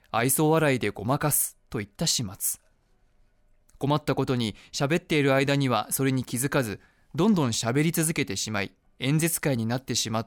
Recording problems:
none

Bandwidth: 17.5 kHz